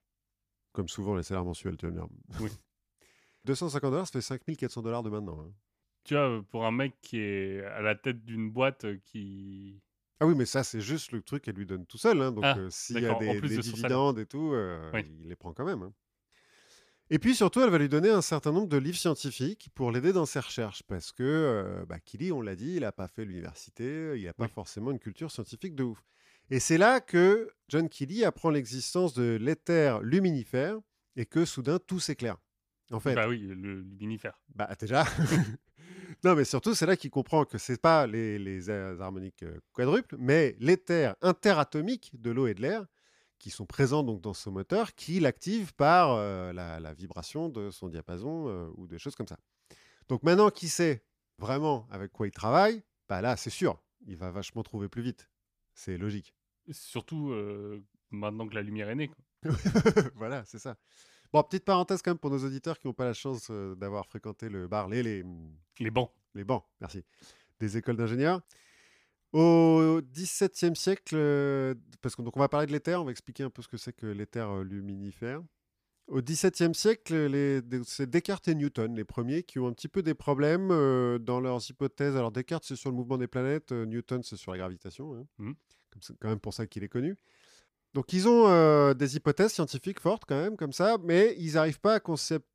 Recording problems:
none

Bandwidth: 15 kHz